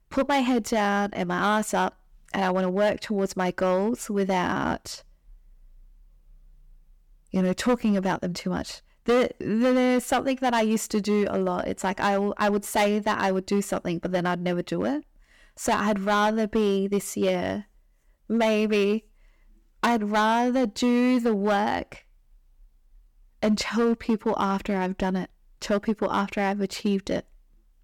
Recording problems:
distortion; slight; 6% of the sound clipped

